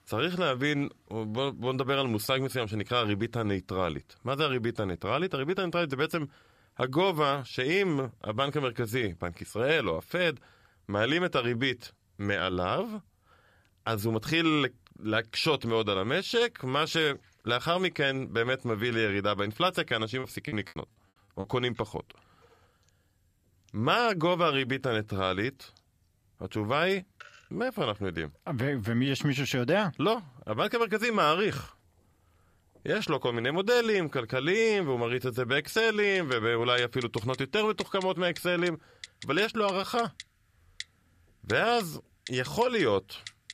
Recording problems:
household noises; noticeable; throughout; 20 dB below the speech
choppy; very; from 20 to 21 s; 18% of the speech affected

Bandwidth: 14.5 kHz